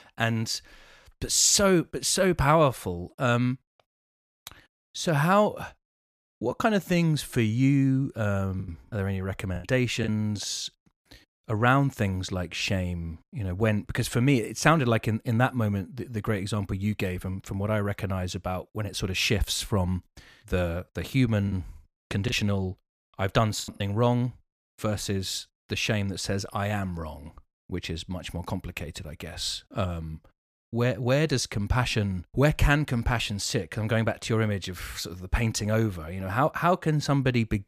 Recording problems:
choppy; very; from 8.5 to 10 s and from 21 to 24 s; 10% of the speech affected

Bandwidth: 14.5 kHz